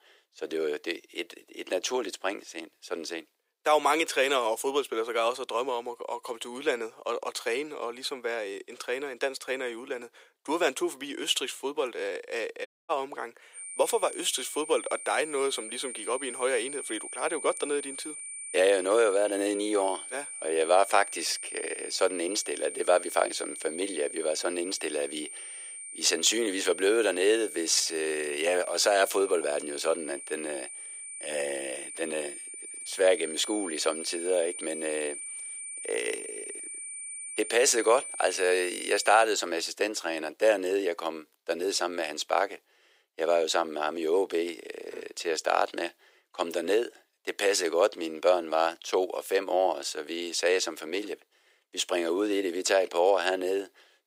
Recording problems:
thin; very; fading below 450 Hz
high-pitched whine; loud; from 14 to 39 s; 9 kHz, 9 dB below the speech
audio cutting out; at 13 s

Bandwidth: 15.5 kHz